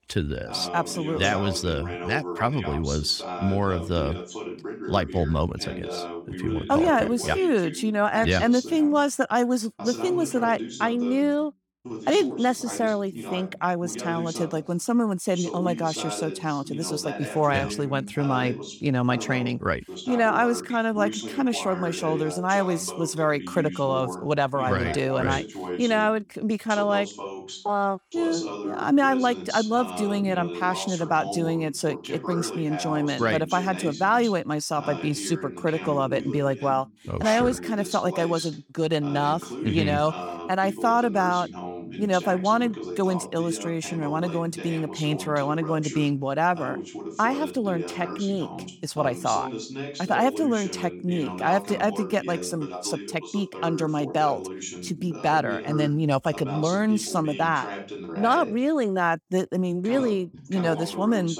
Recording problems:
voice in the background; loud; throughout; 10 dB below the speech

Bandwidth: 18.5 kHz